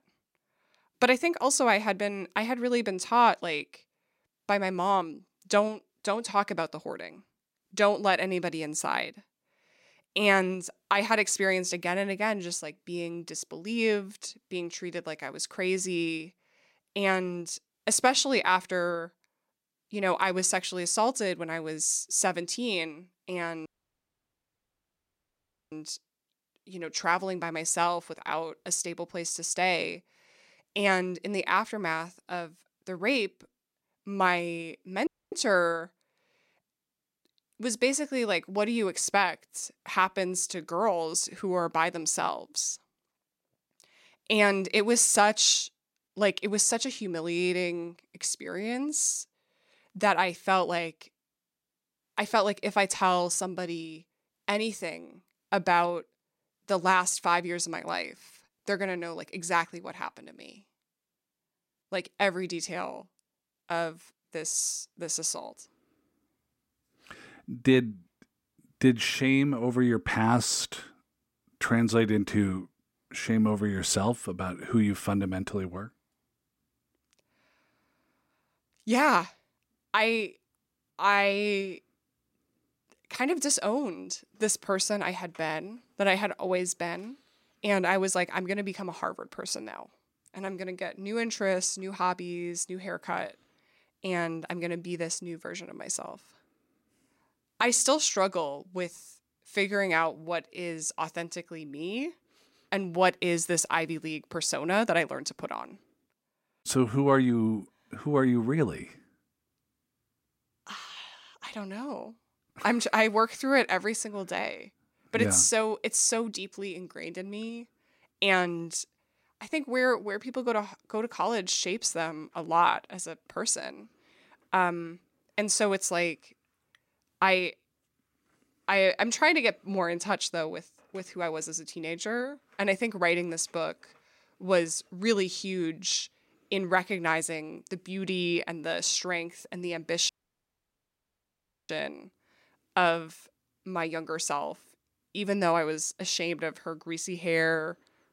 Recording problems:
audio cutting out; at 24 s for 2 s, at 35 s and at 2:20 for 1.5 s

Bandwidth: 16 kHz